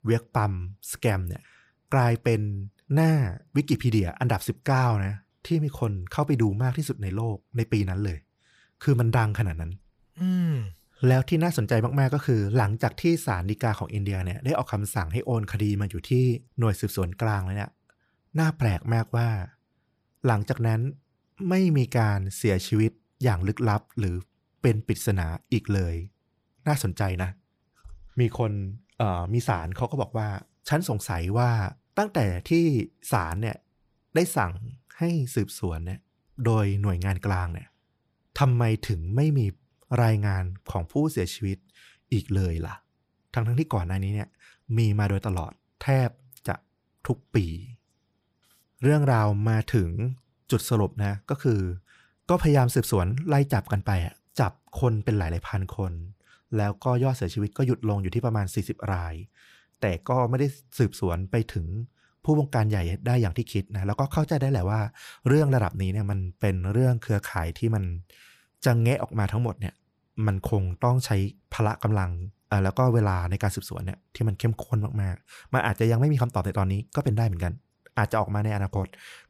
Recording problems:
none

